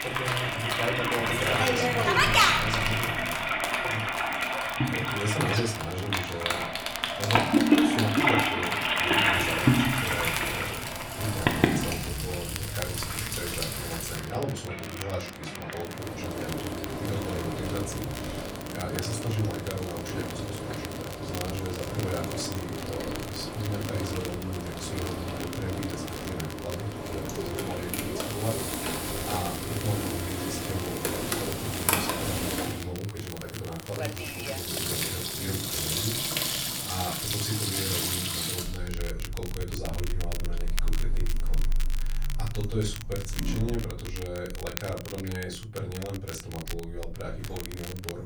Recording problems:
off-mic speech; far
room echo; slight; dies away in 0.3 s
household noises; very loud; throughout; 6 dB above the speech
train or aircraft noise; loud; until 37 s; 10 dB below the speech
crackle, like an old record; loud; 7 dB below the speech

